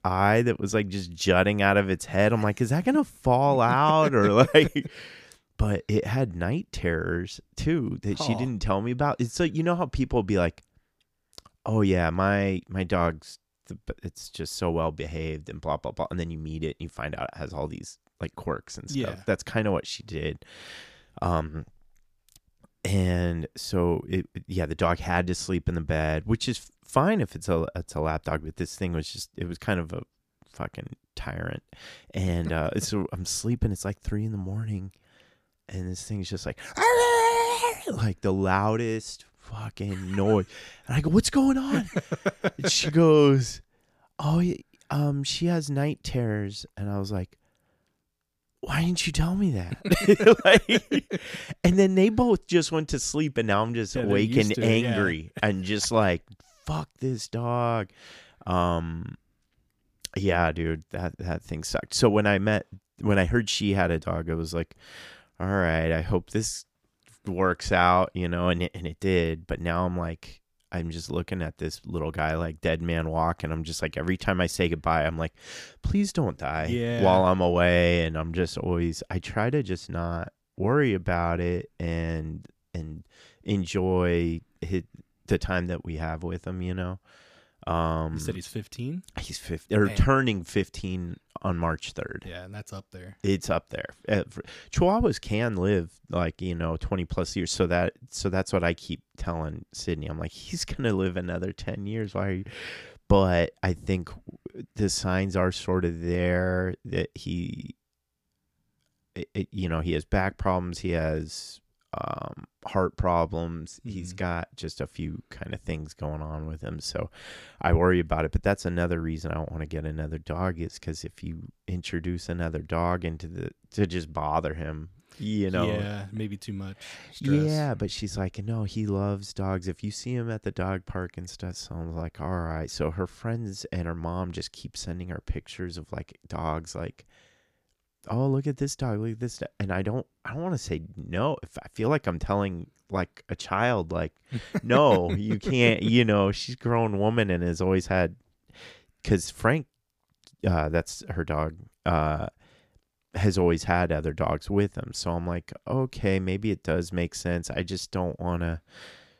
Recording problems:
none

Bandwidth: 15 kHz